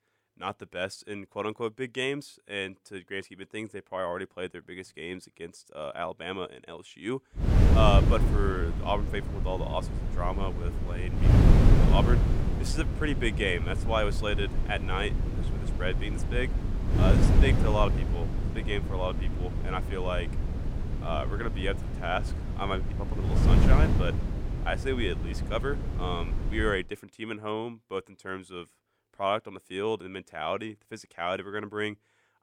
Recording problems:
wind noise on the microphone; heavy; from 7.5 to 27 s; 5 dB below the speech

